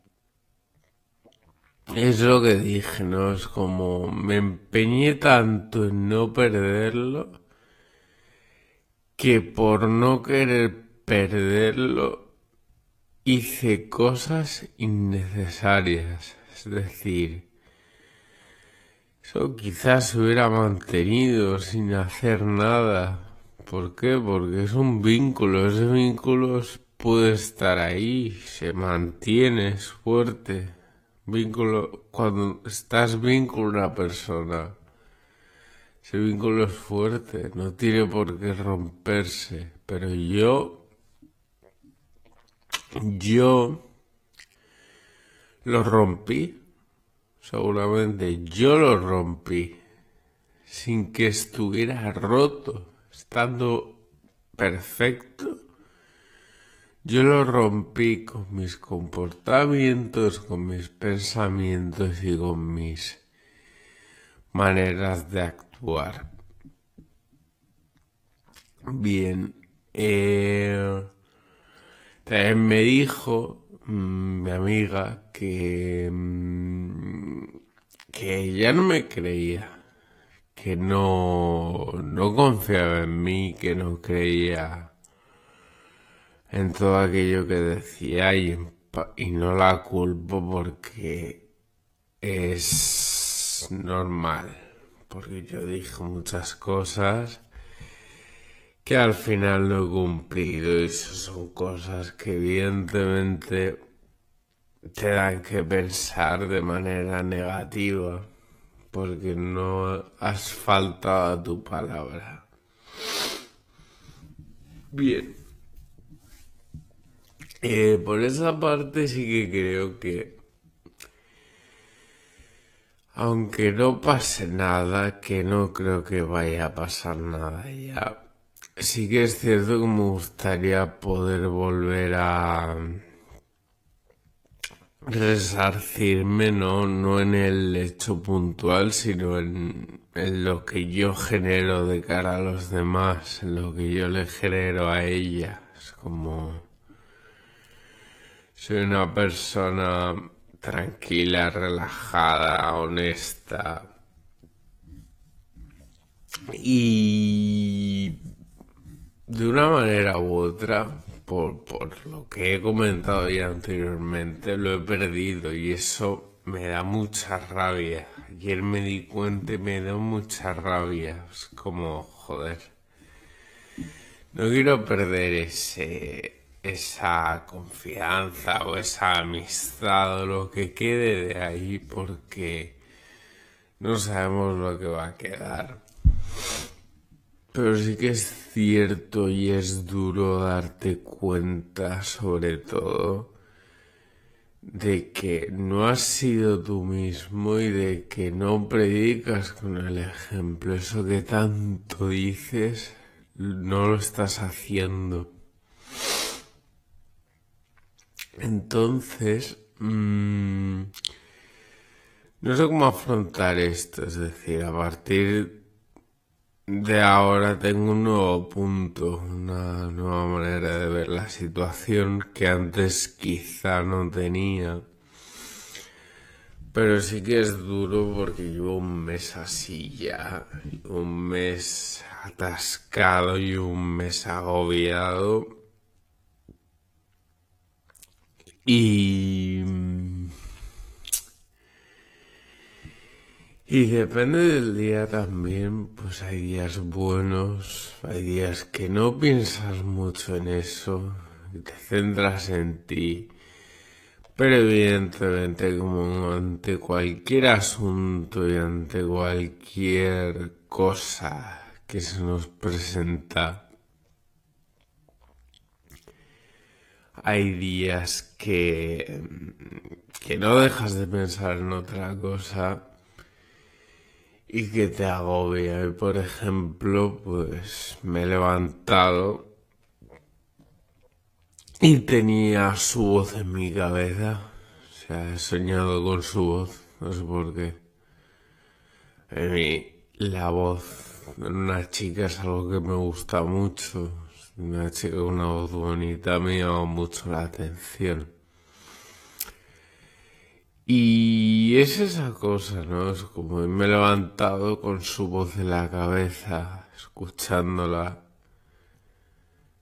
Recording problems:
wrong speed, natural pitch; too slow; 0.5 times normal speed
garbled, watery; slightly; nothing above 14.5 kHz

